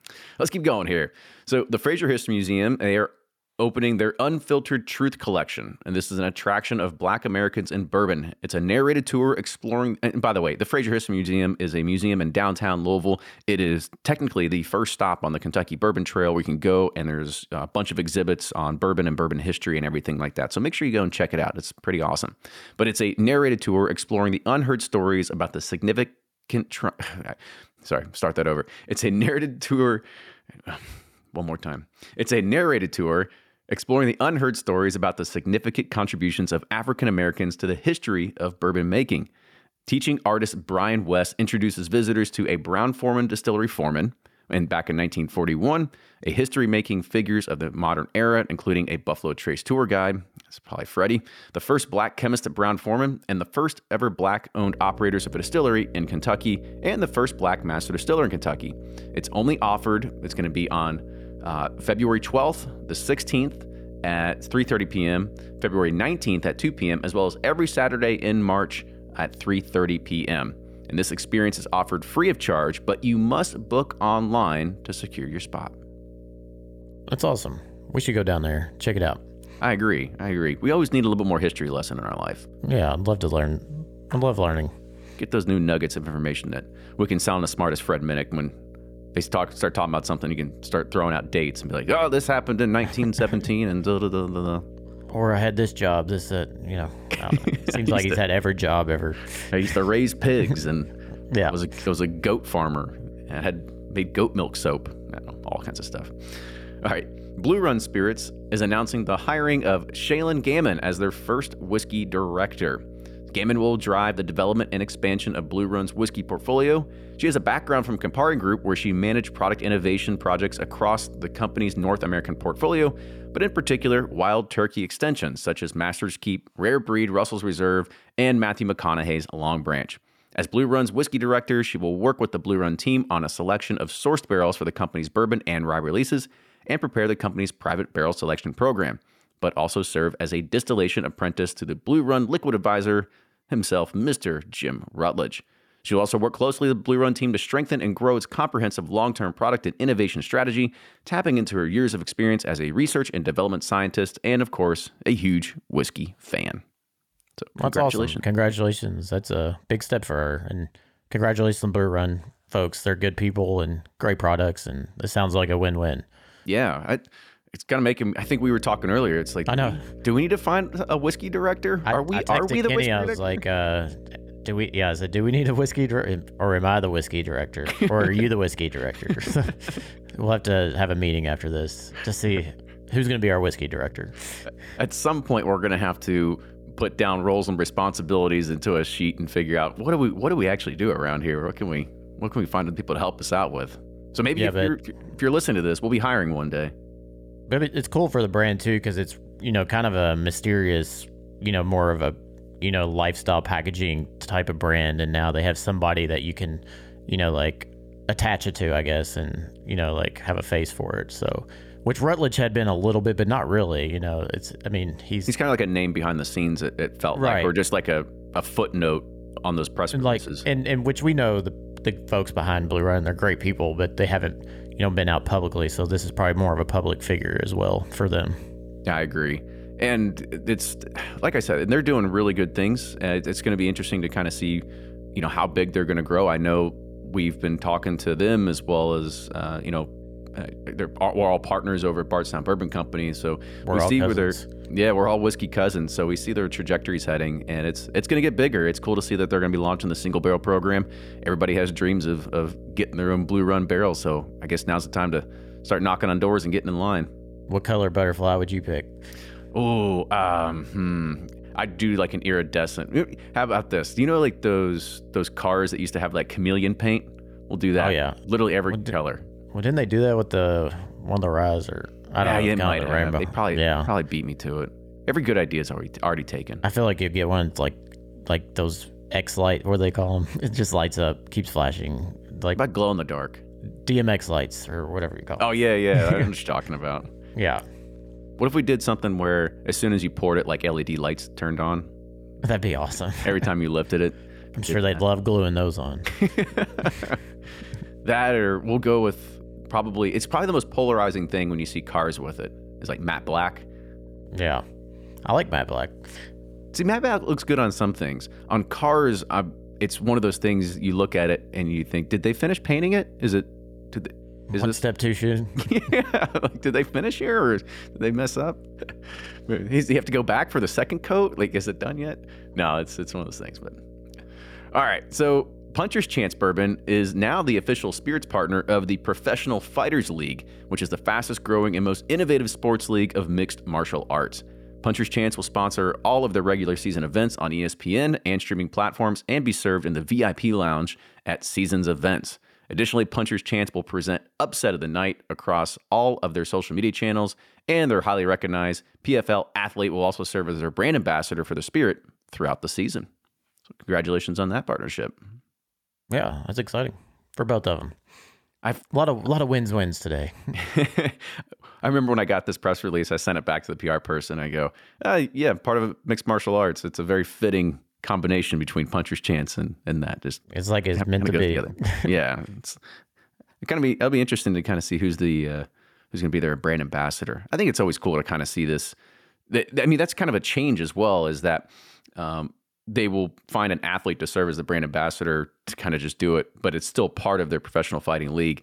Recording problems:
electrical hum; faint; from 55 s to 2:04 and from 2:48 to 5:37; 60 Hz, 25 dB below the speech

